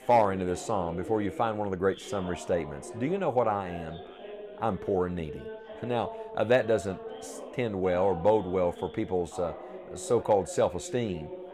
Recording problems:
background chatter; noticeable; throughout; 4 voices, 15 dB below the speech

